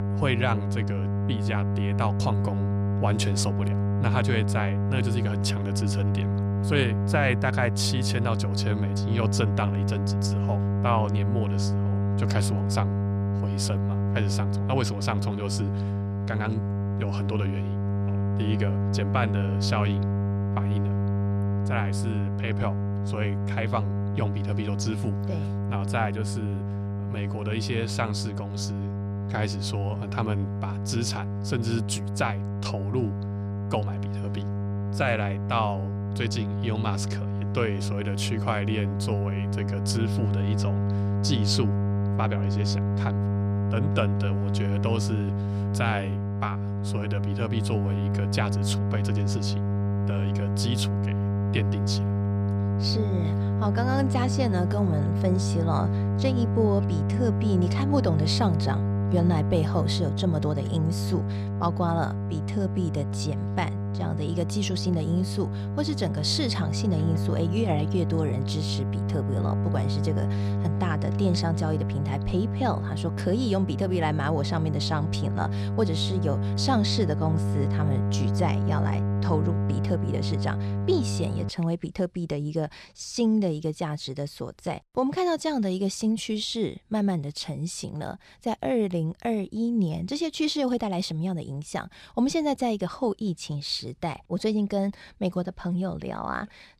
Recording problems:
electrical hum; loud; until 1:21; 50 Hz, 5 dB below the speech

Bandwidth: 14.5 kHz